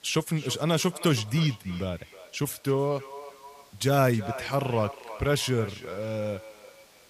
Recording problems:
echo of what is said; noticeable; throughout; 320 ms later, 15 dB below the speech
hiss; faint; throughout; 25 dB below the speech

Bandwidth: 15 kHz